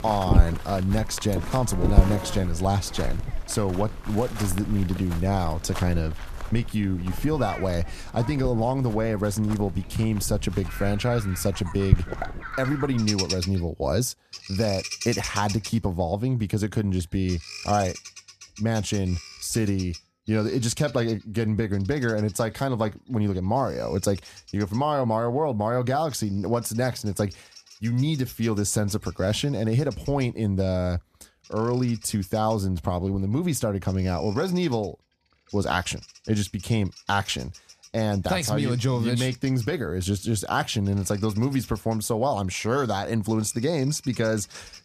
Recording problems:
animal sounds; loud; throughout; 7 dB below the speech

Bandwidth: 14.5 kHz